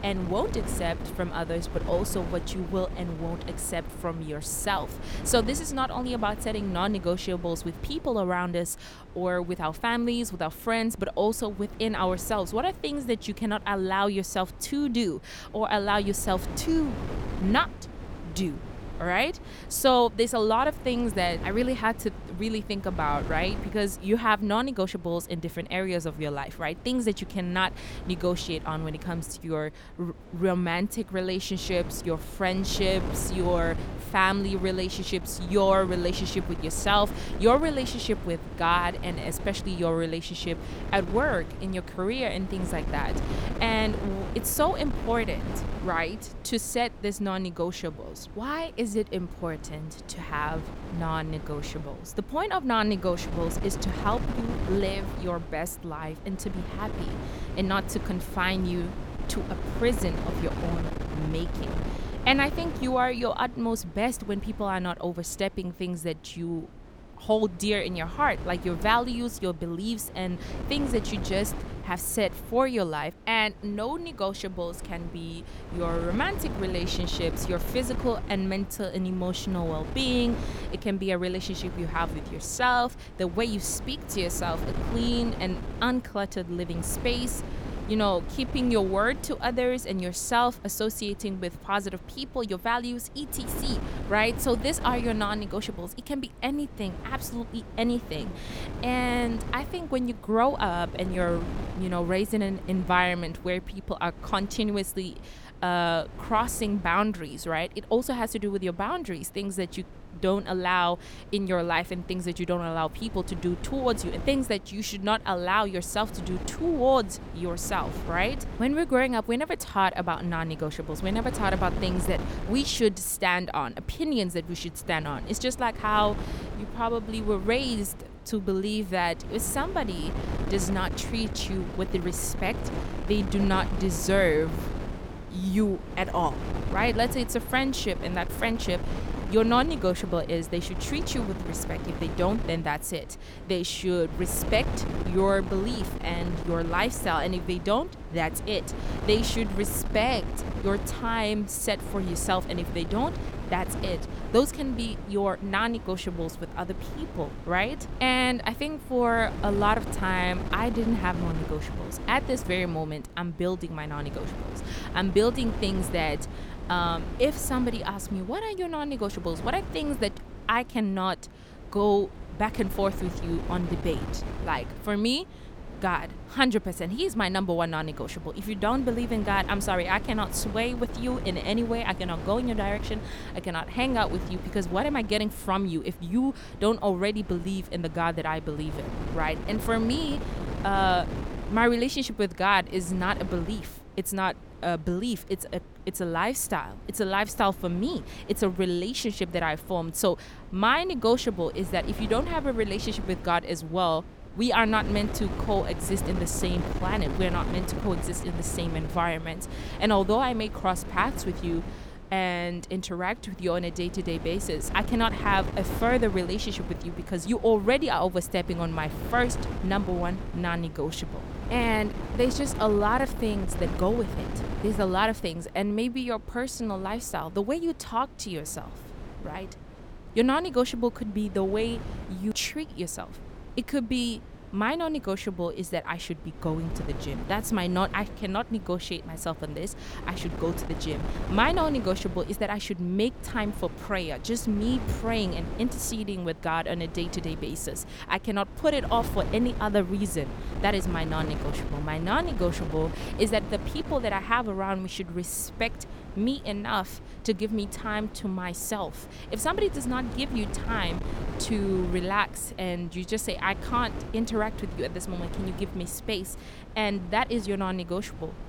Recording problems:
wind noise on the microphone; occasional gusts; 15 dB below the speech

